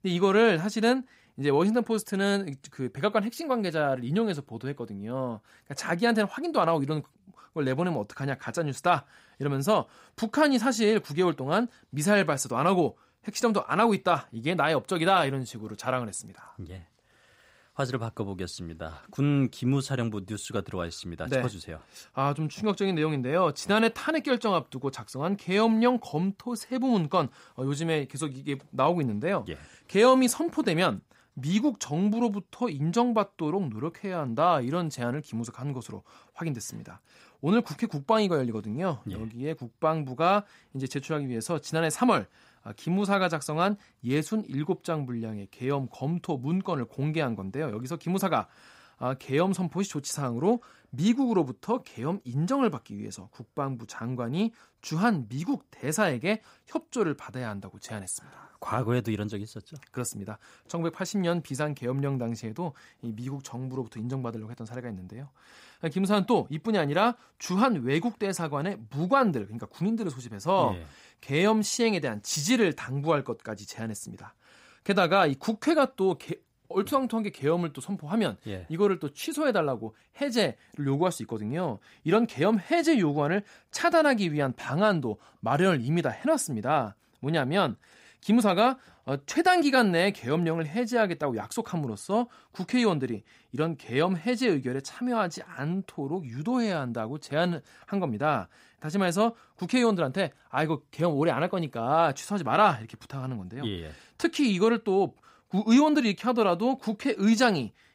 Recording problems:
none

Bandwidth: 15.5 kHz